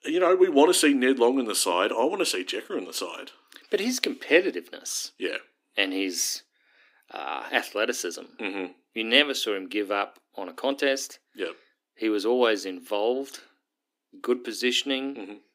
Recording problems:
thin; very slightly; fading below 300 Hz

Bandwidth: 15.5 kHz